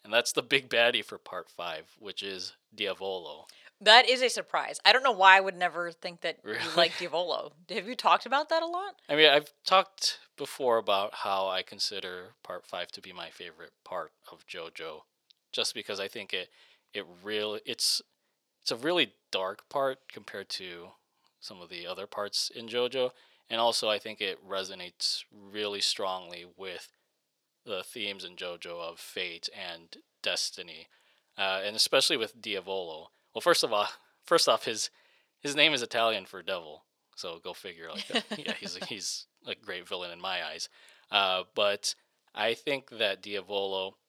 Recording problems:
thin; somewhat; fading below 450 Hz

